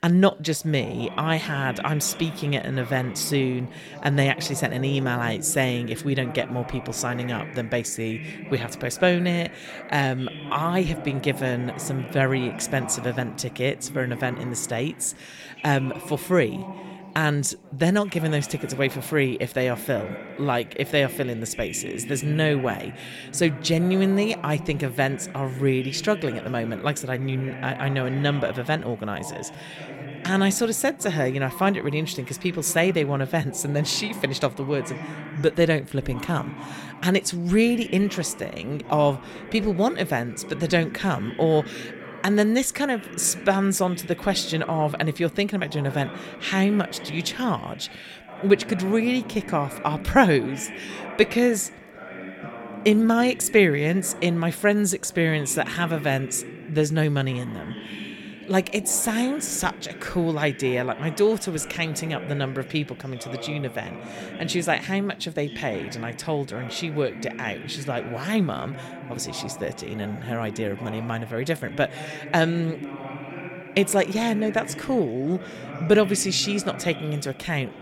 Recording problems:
background chatter; noticeable; throughout; 4 voices, 15 dB below the speech

